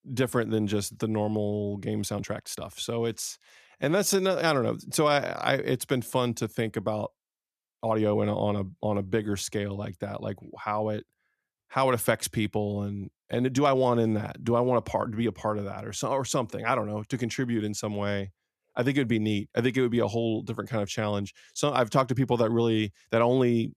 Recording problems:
uneven, jittery; strongly; from 2 to 14 s

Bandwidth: 14.5 kHz